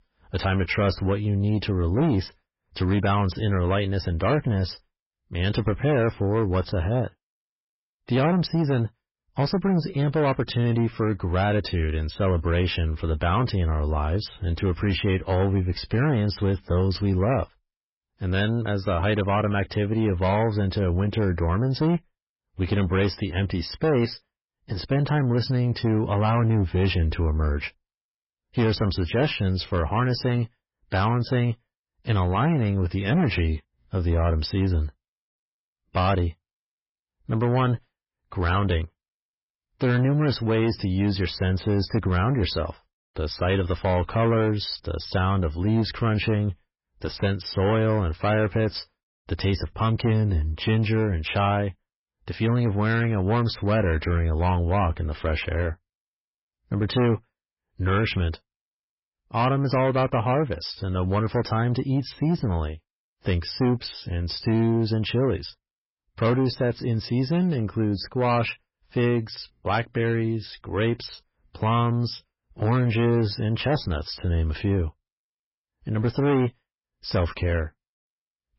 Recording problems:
garbled, watery; badly; nothing above 5.5 kHz
distortion; slight; 10 dB below the speech

